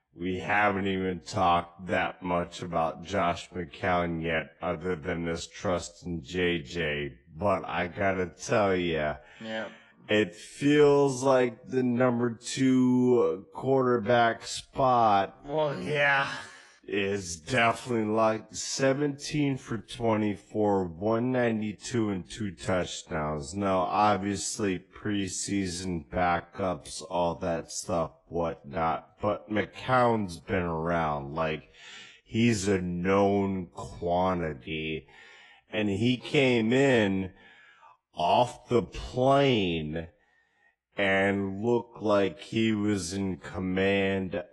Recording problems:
wrong speed, natural pitch; too slow; 0.5 times normal speed
garbled, watery; slightly; nothing above 11 kHz

